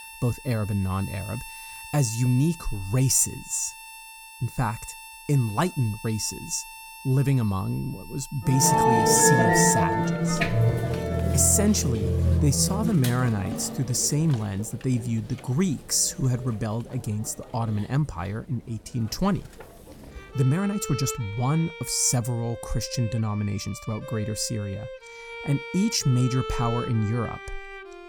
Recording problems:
background music; loud; throughout; 3 dB below the speech
uneven, jittery; strongly; from 12 to 27 s

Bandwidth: 18 kHz